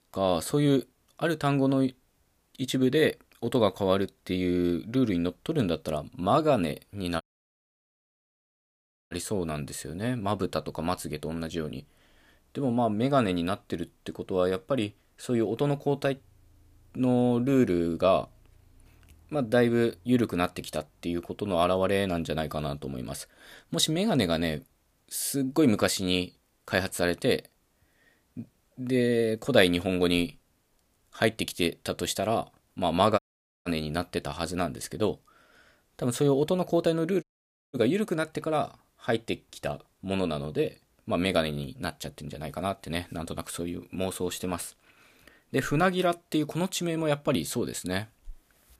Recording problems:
audio cutting out; at 7 s for 2 s, at 33 s and at 37 s for 0.5 s

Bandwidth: 15 kHz